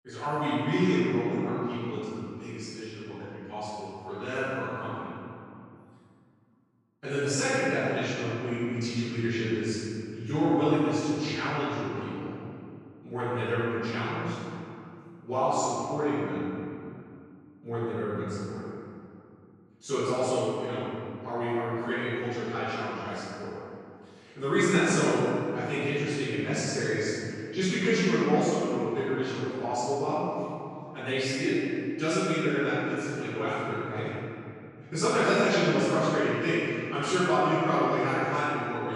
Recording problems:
room echo; strong; dies away in 2.6 s
off-mic speech; far
abrupt cut into speech; at the end

